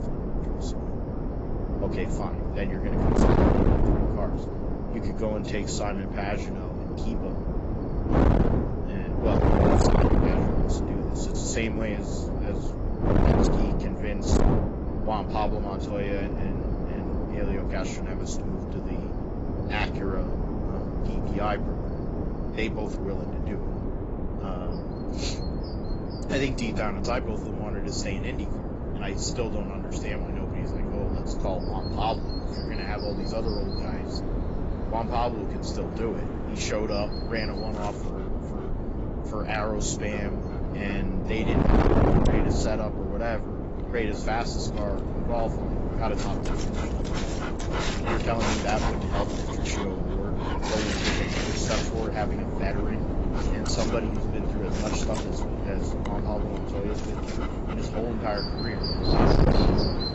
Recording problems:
distortion; heavy; 4% of the sound clipped
garbled, watery; badly; nothing above 7.5 kHz
wind noise on the microphone; heavy; as loud as the speech
animal sounds; loud; throughout; 4 dB below the speech

